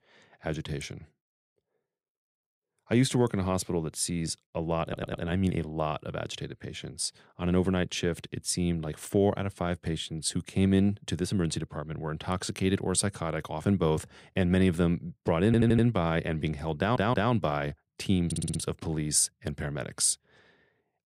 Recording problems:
audio stuttering; 4 times, first at 5 s

